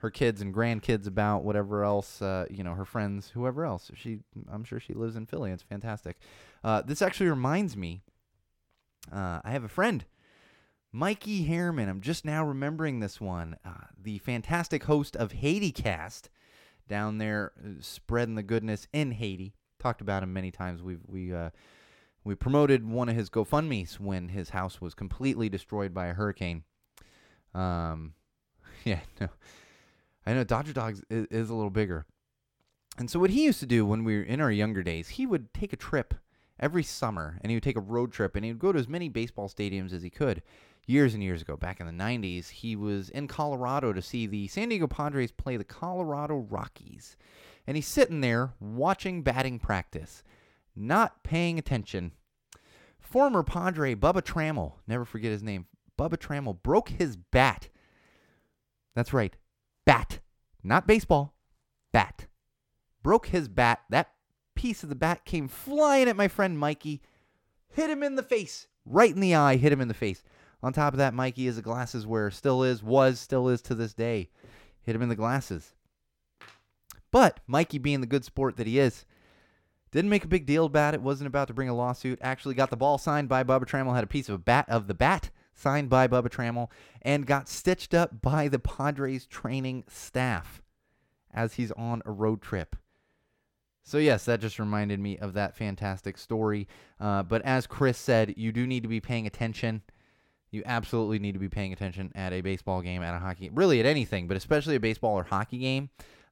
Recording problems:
none

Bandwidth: 17 kHz